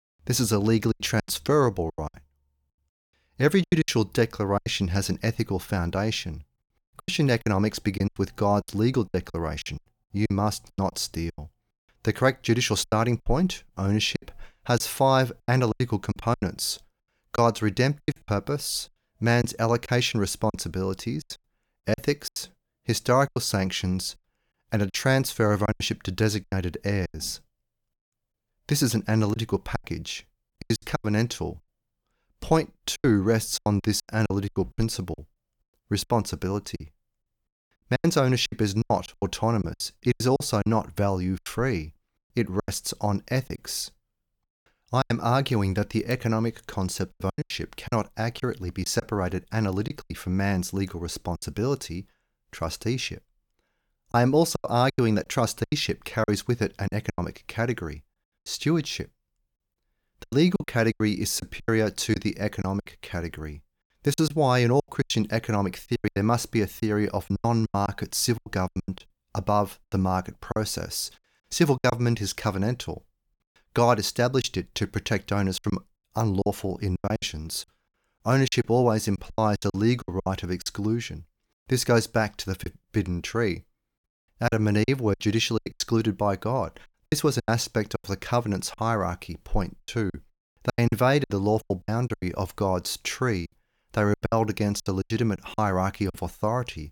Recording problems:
choppy; very; 12% of the speech affected

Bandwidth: 18 kHz